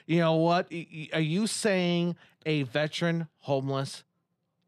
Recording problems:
none

